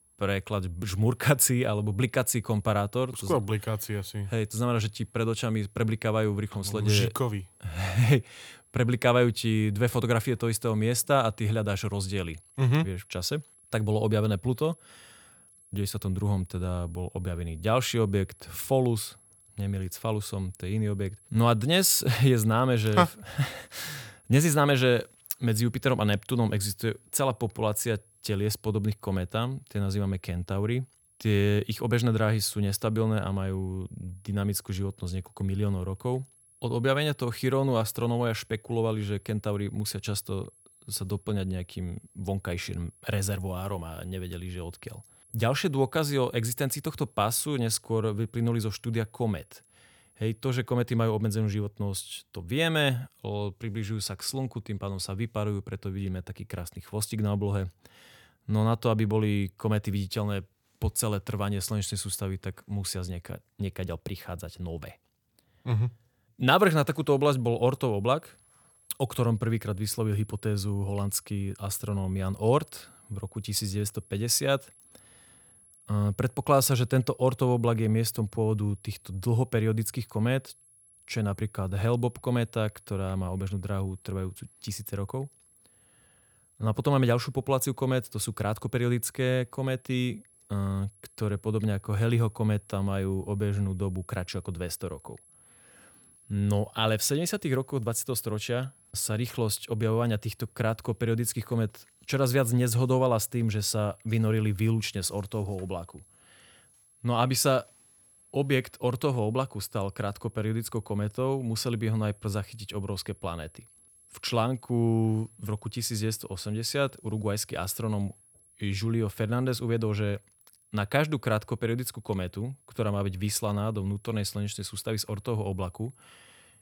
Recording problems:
high-pitched whine; faint; until 51 s and from 1:07 on; 11 kHz, 30 dB below the speech

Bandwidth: 18.5 kHz